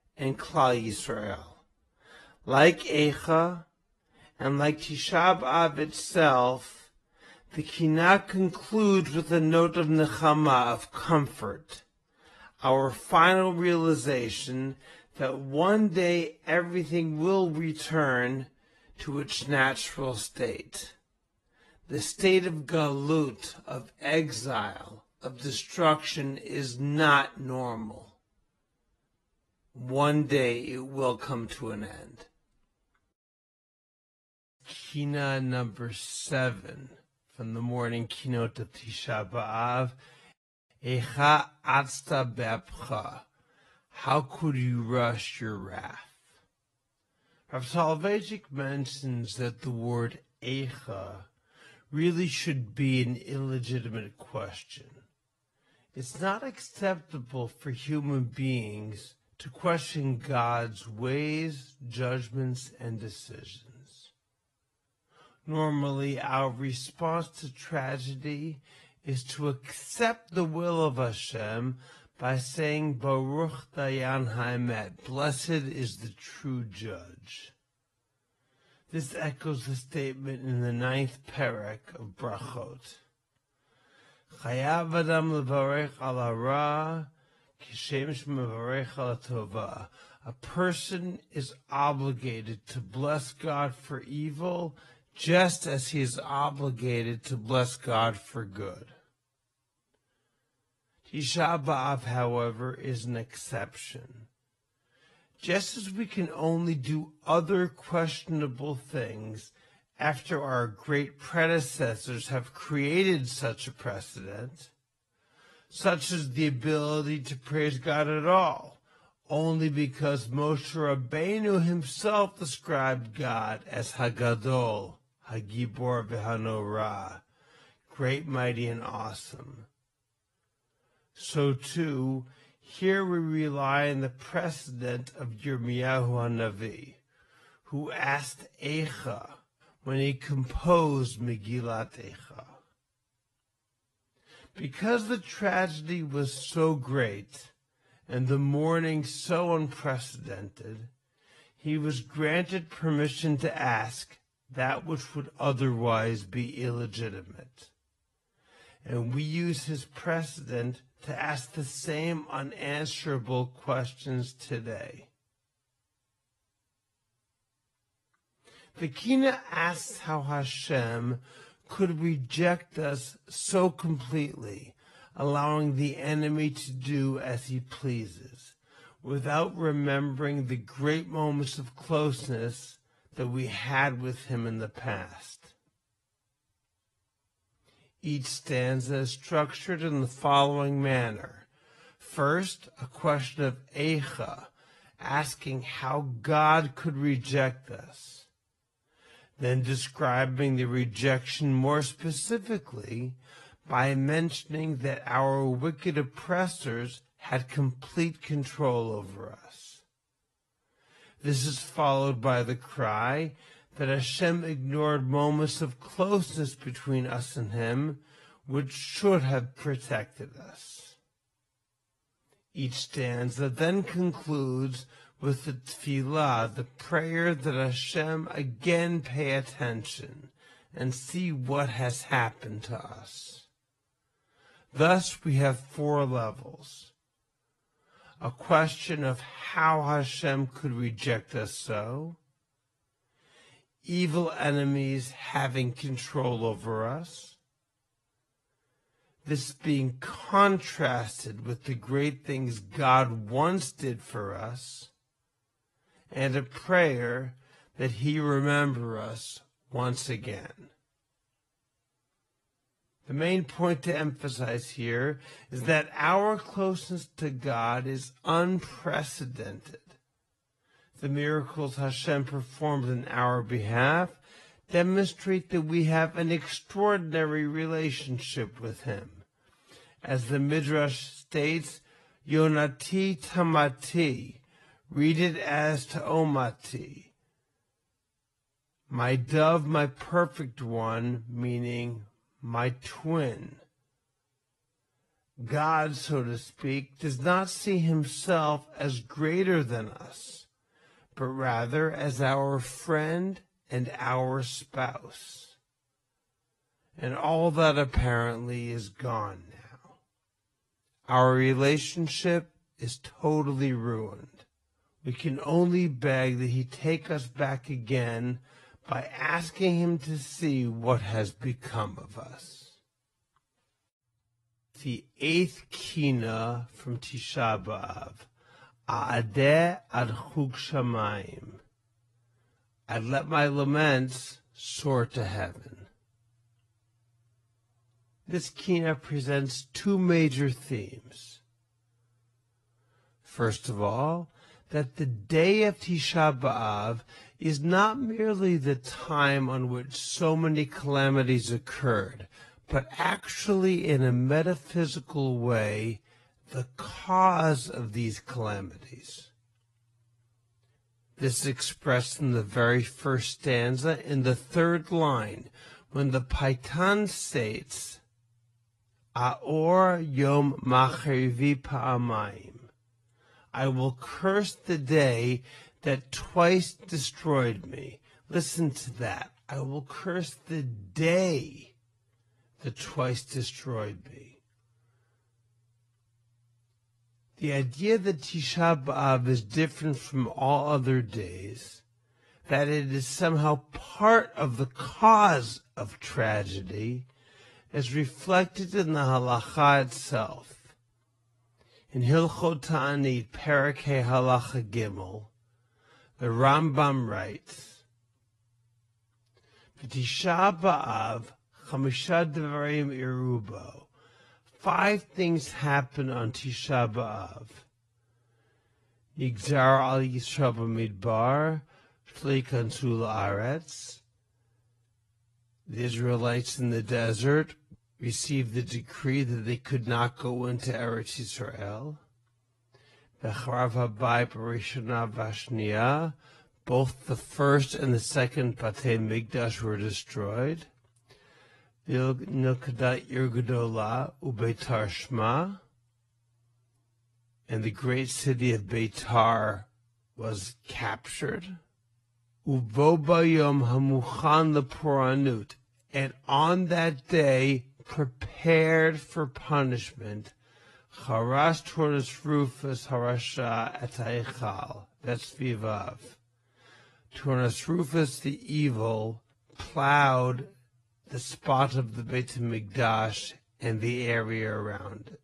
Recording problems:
wrong speed, natural pitch; too slow; 0.6 times normal speed
garbled, watery; slightly; nothing above 11.5 kHz

